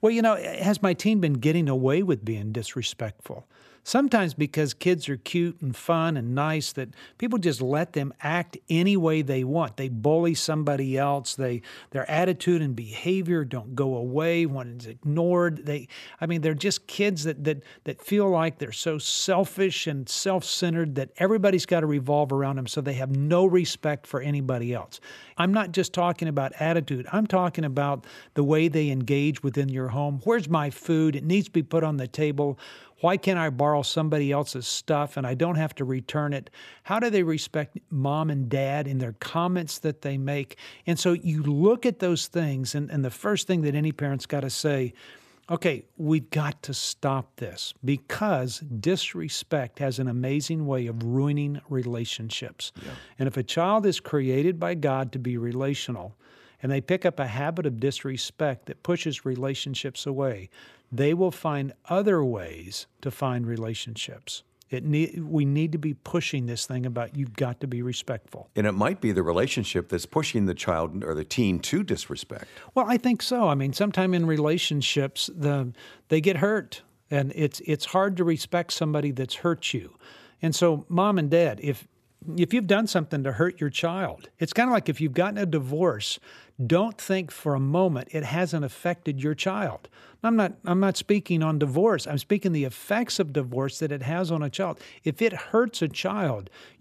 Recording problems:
none

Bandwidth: 14.5 kHz